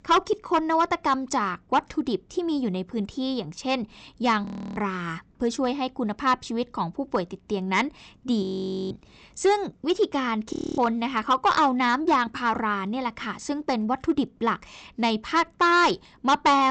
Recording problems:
high frequencies cut off; noticeable; nothing above 8 kHz
distortion; slight; 2% of the sound clipped
audio freezing; at 4.5 s, at 8.5 s and at 11 s
abrupt cut into speech; at the end

